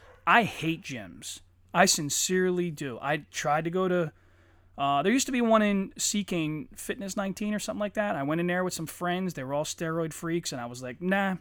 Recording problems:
none

